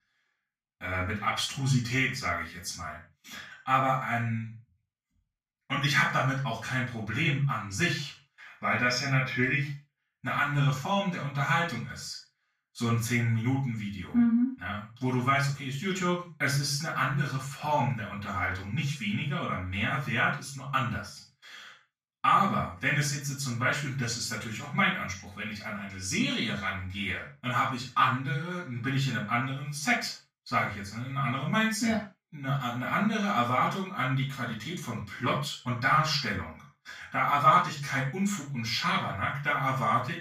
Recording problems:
off-mic speech; far
room echo; noticeable; dies away in 0.3 s

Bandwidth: 14.5 kHz